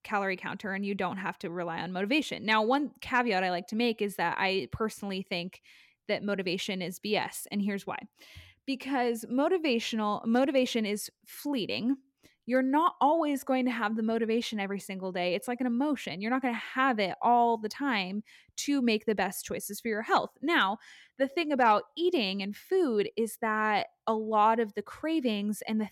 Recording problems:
none

